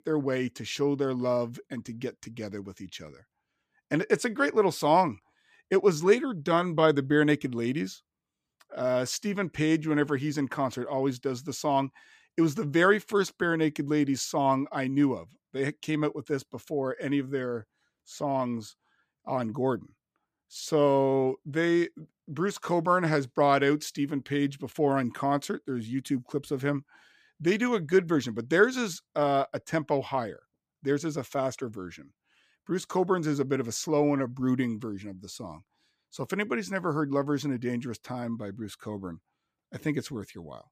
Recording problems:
none

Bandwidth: 15 kHz